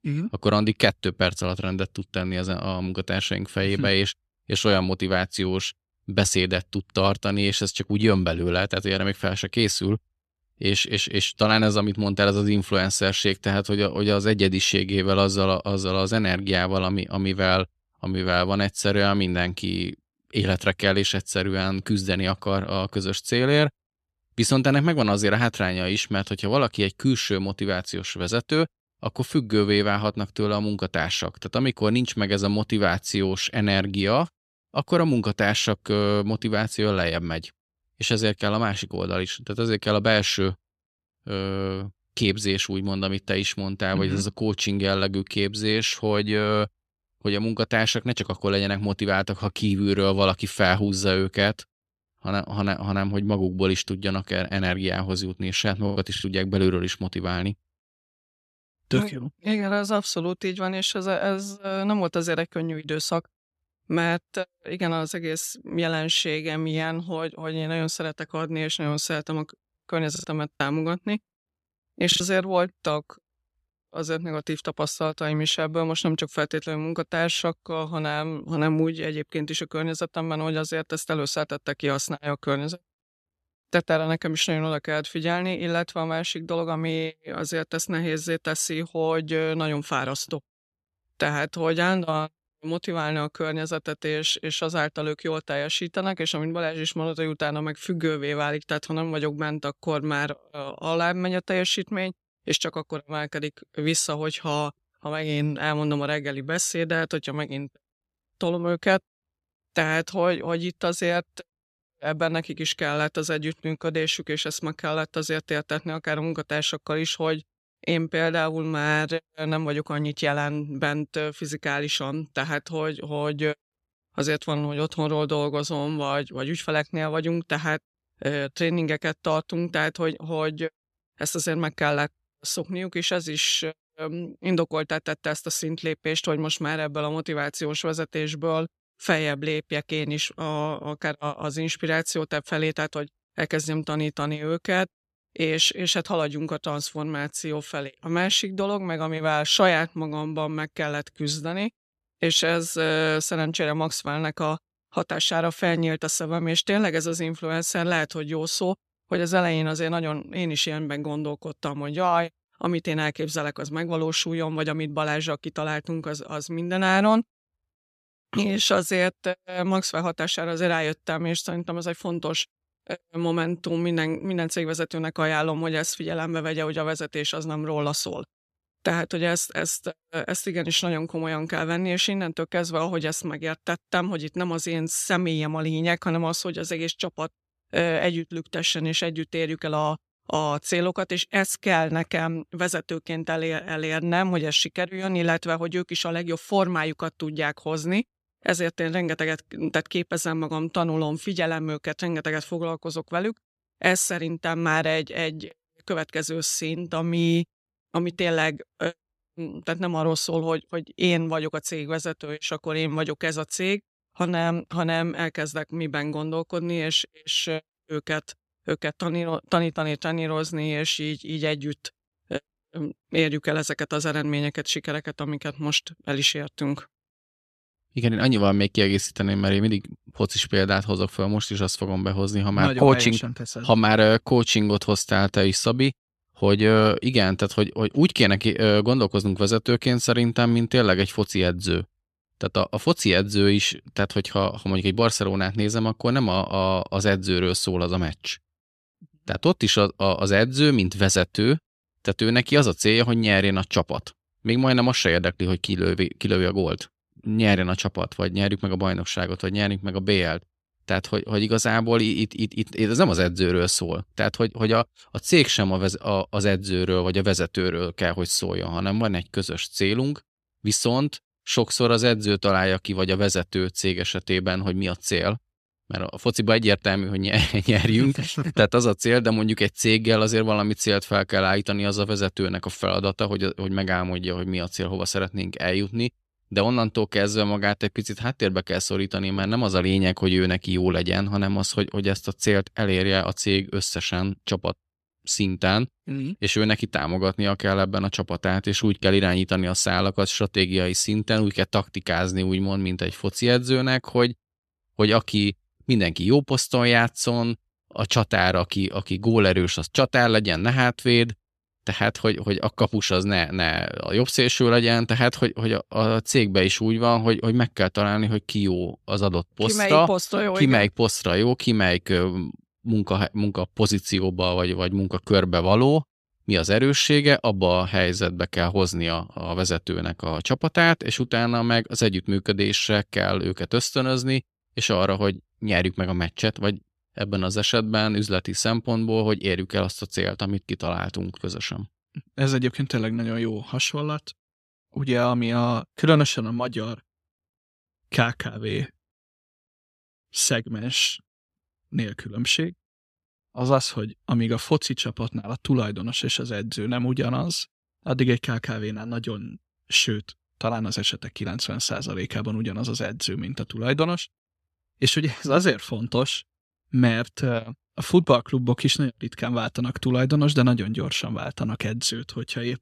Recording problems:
choppy; very; at 56 s and from 1:10 to 1:12; 6% of the speech affected

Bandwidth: 14 kHz